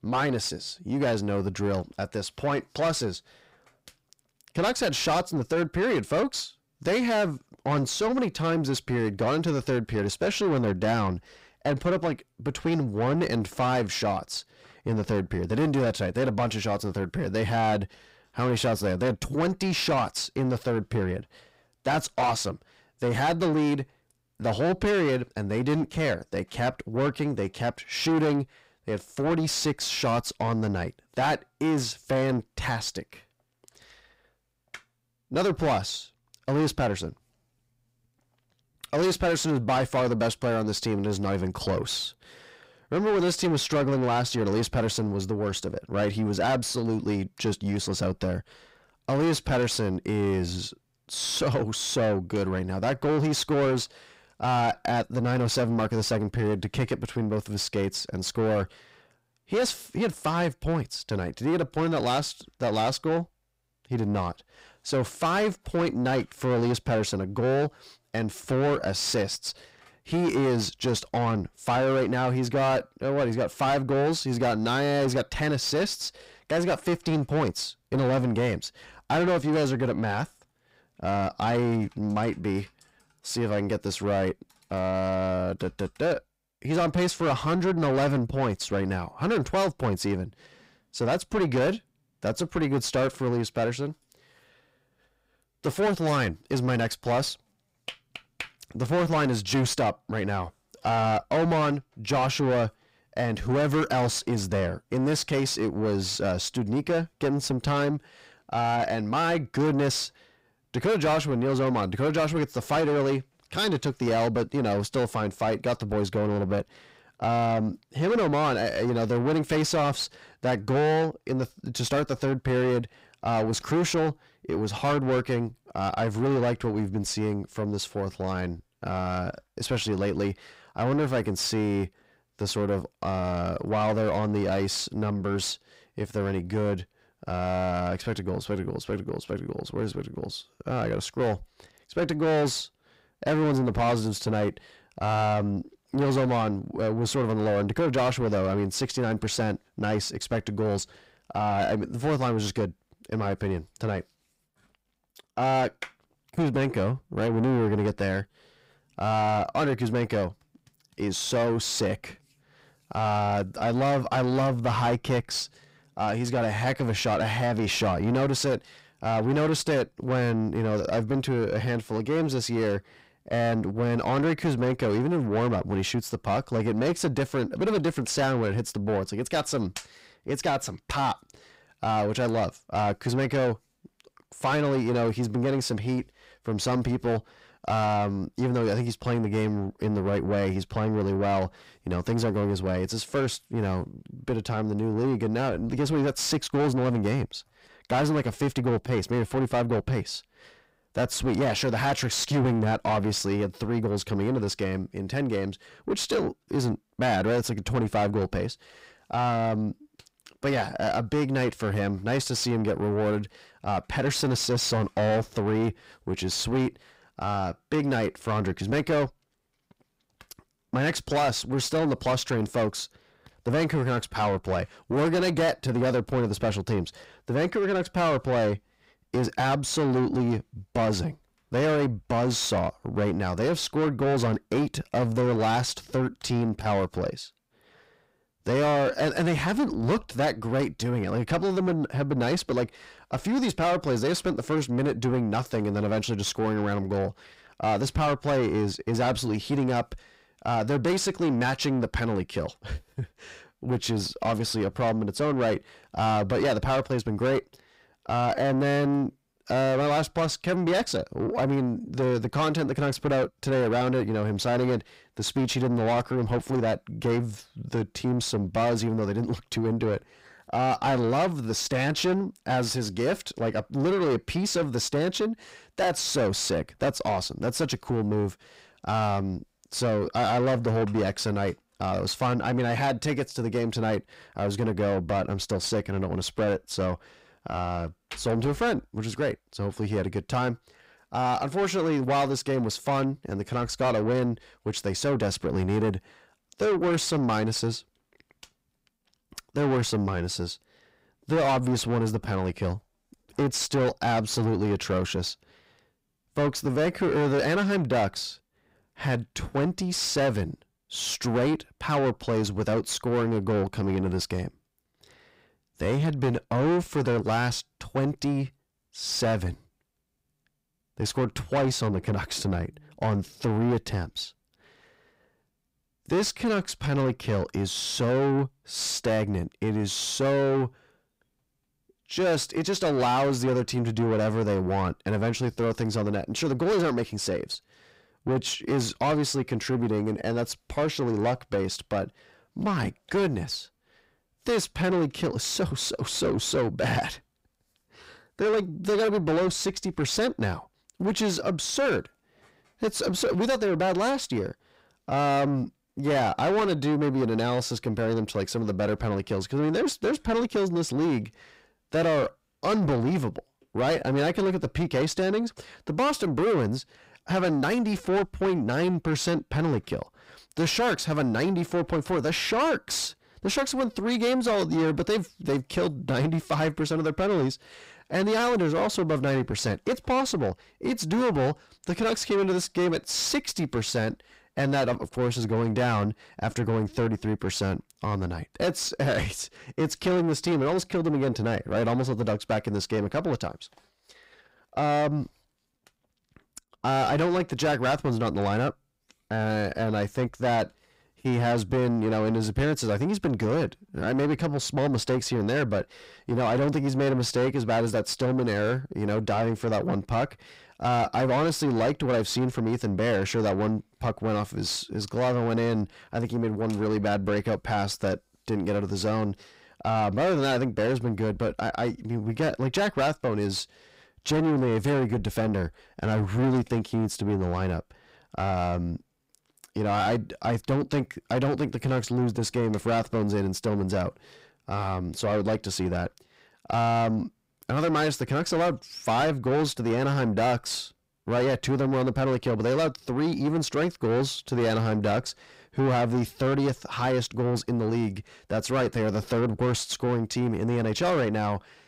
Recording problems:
distortion; heavy; 7 dB below the speech

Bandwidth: 15.5 kHz